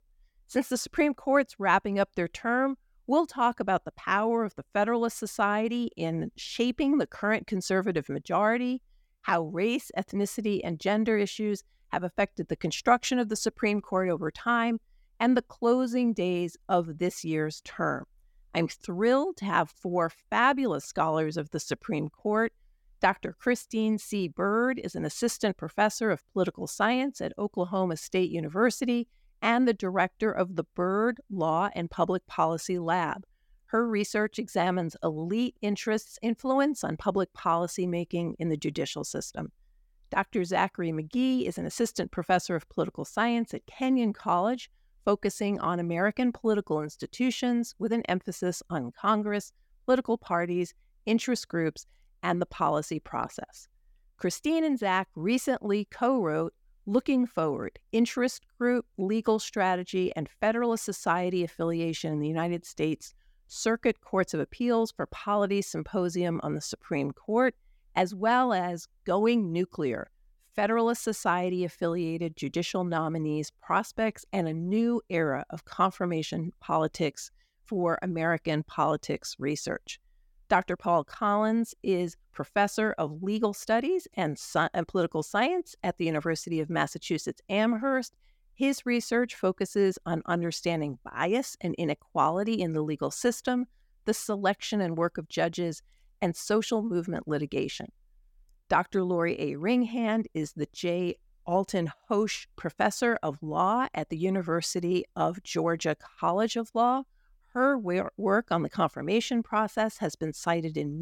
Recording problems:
abrupt cut into speech; at the end

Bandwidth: 17.5 kHz